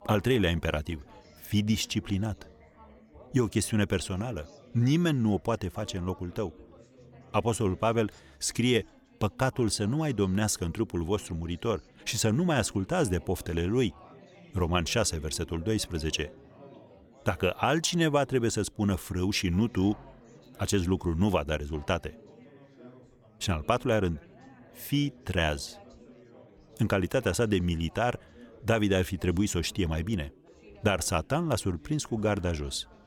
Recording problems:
chatter from many people; faint; throughout; 25 dB below the speech

